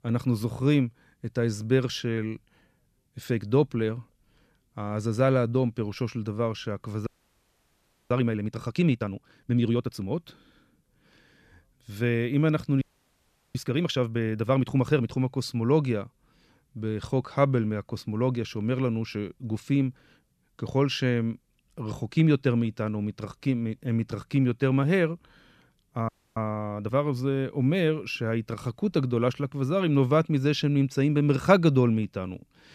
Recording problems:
audio freezing; at 7 s for 1 s, at 13 s for 0.5 s and at 26 s

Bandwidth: 14 kHz